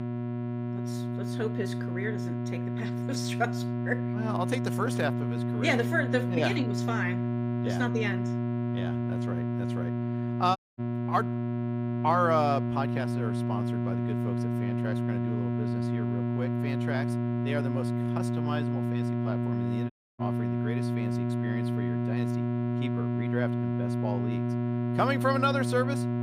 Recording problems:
electrical hum; loud; throughout; 60 Hz, 5 dB below the speech
audio cutting out; at 11 s and at 20 s

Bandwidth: 15.5 kHz